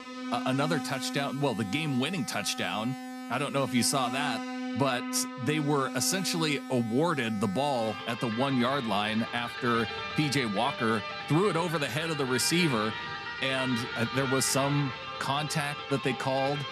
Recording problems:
background music; loud; throughout; 7 dB below the speech

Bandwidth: 14 kHz